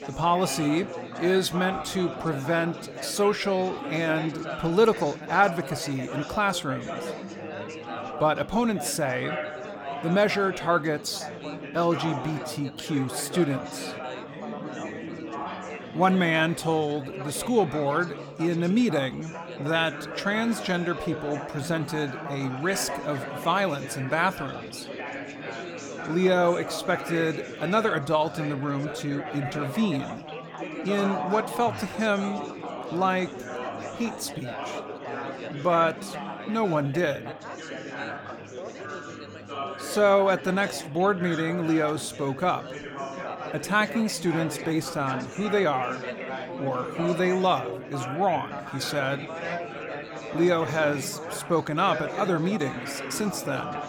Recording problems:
chatter from many people; loud; throughout; 9 dB below the speech

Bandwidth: 18 kHz